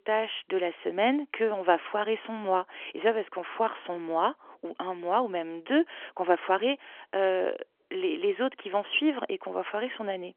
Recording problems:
phone-call audio; nothing above 3 kHz

